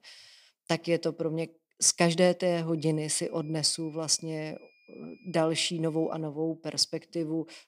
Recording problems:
high-pitched whine; faint; from 3 to 6 s; 2.5 kHz, 30 dB below the speech

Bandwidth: 15.5 kHz